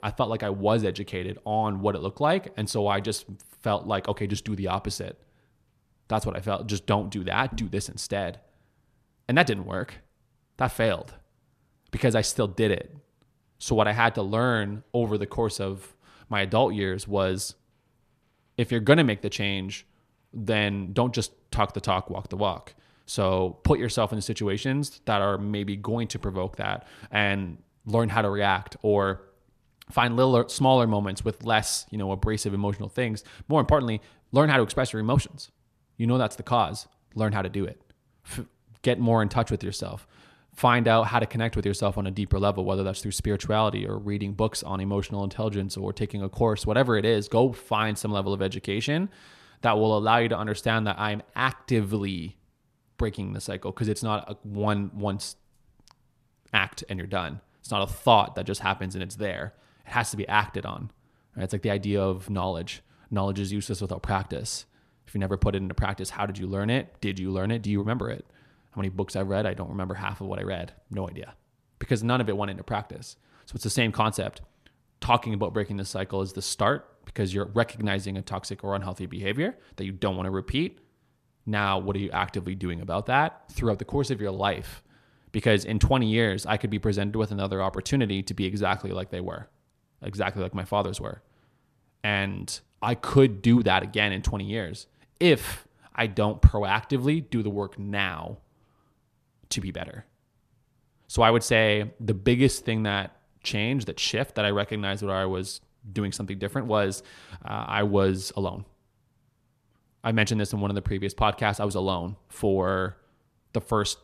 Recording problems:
none

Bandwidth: 14.5 kHz